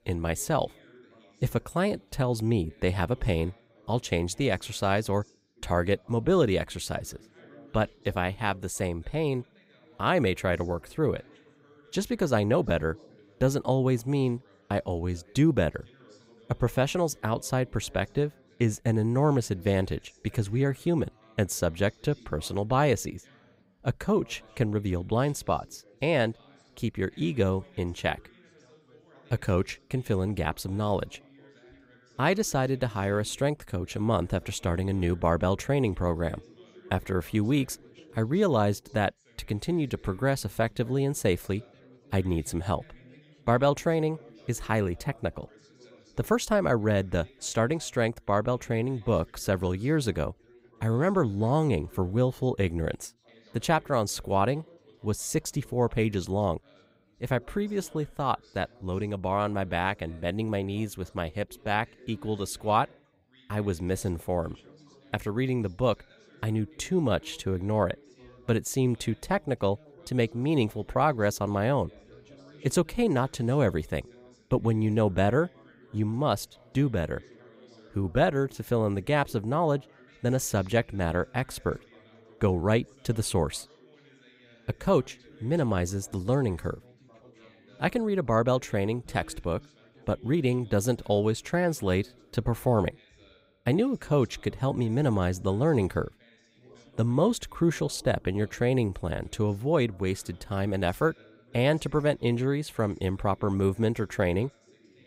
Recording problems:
background chatter; faint; throughout; 3 voices, 25 dB below the speech

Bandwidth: 15.5 kHz